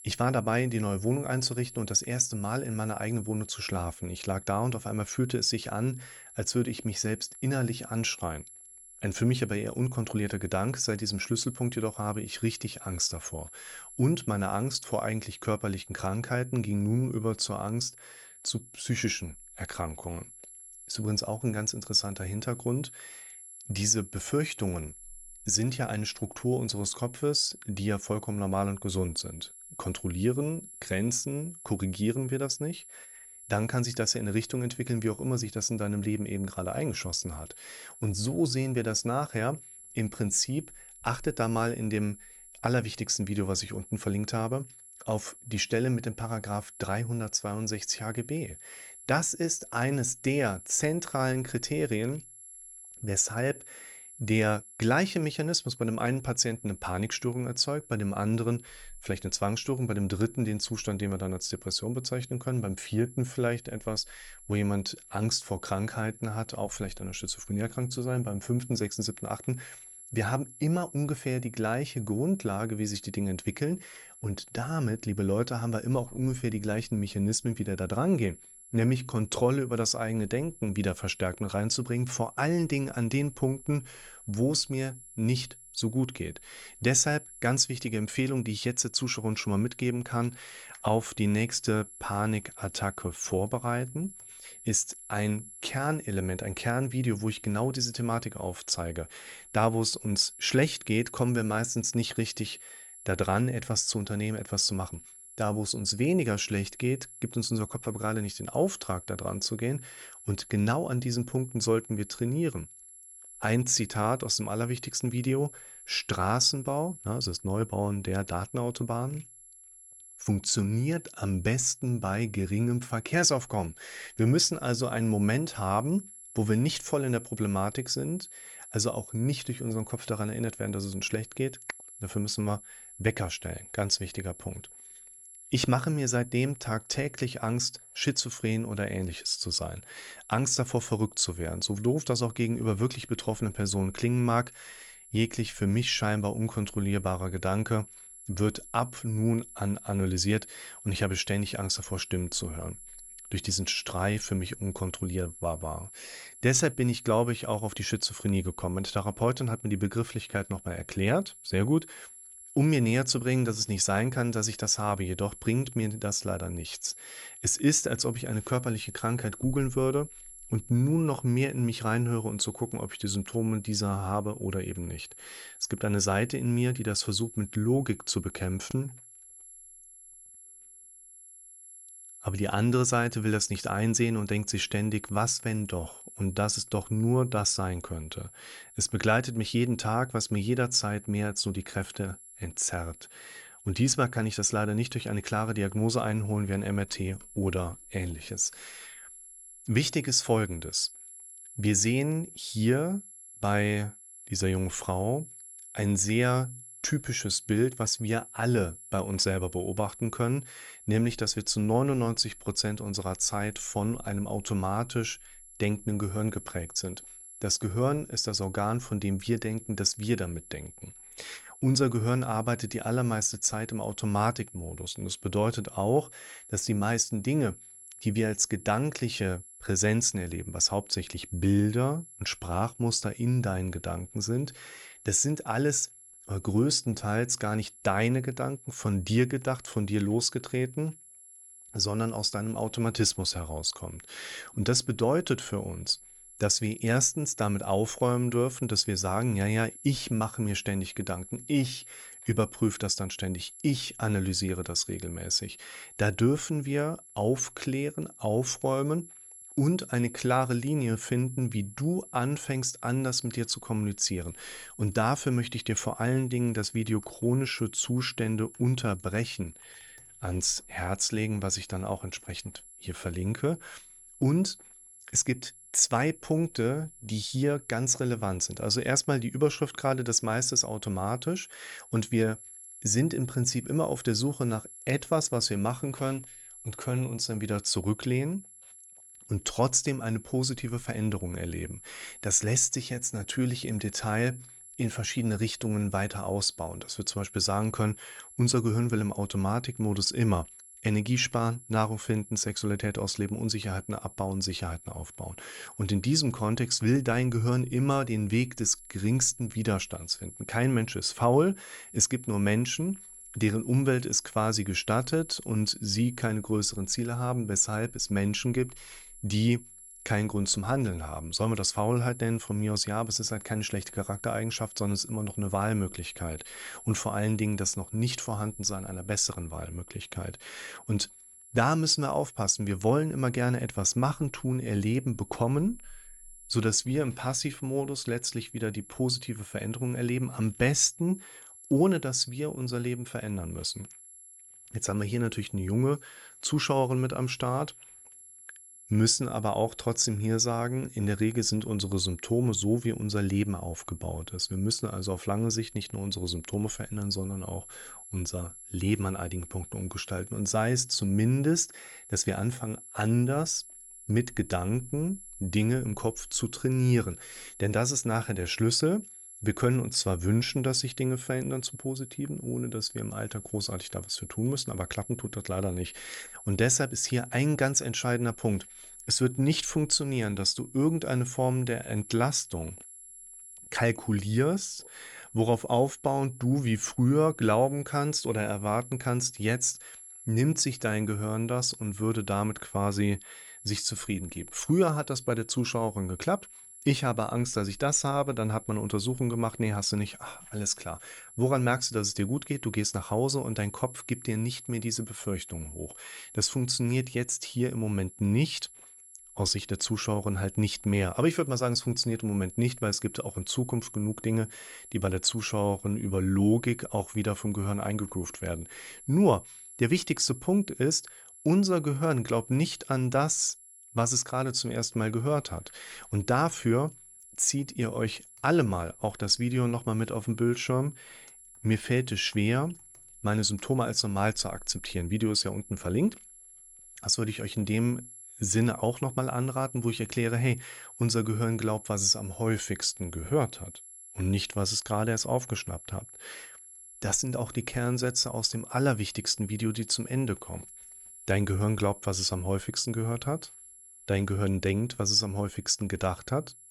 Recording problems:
high-pitched whine; noticeable; throughout; 11 kHz, 15 dB below the speech

